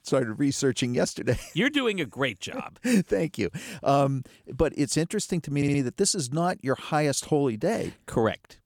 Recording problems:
audio stuttering; at 5.5 s

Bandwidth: 18.5 kHz